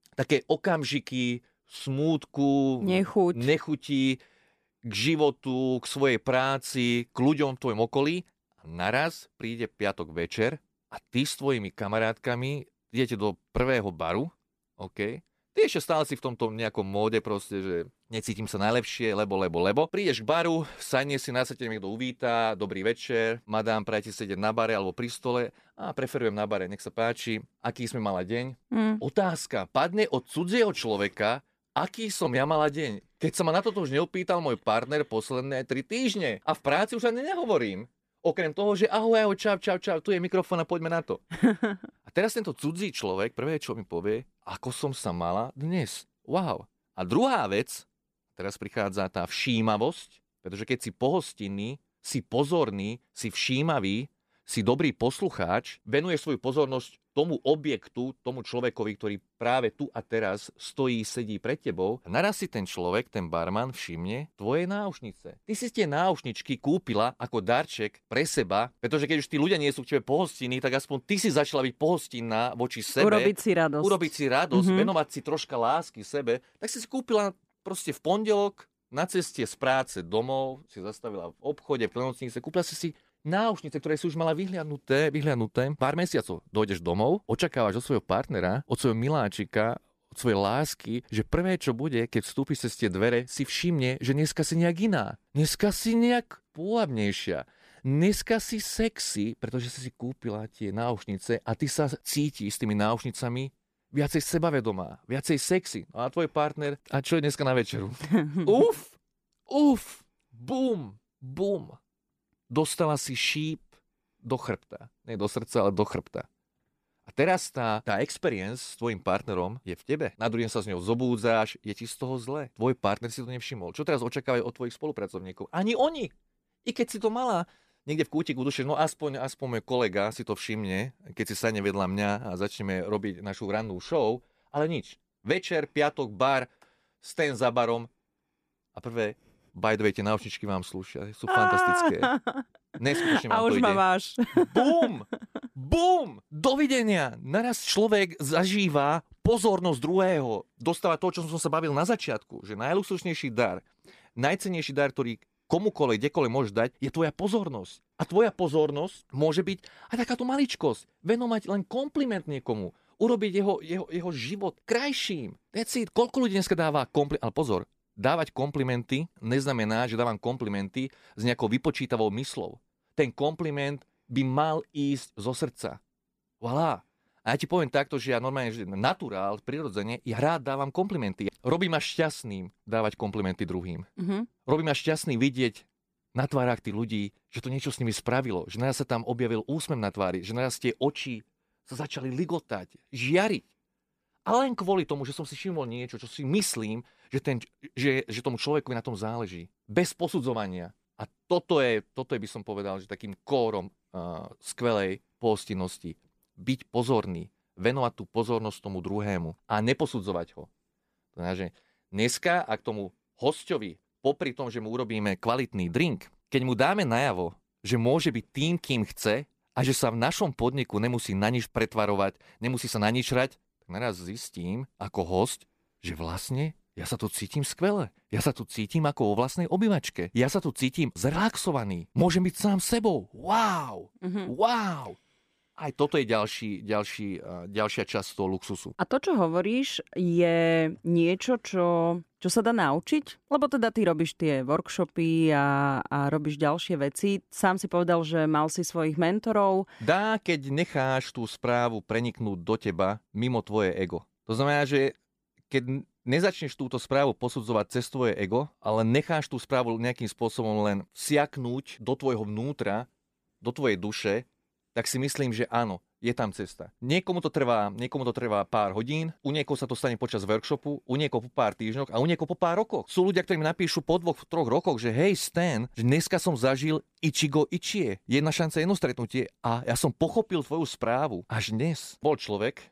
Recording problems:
none

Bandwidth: 14.5 kHz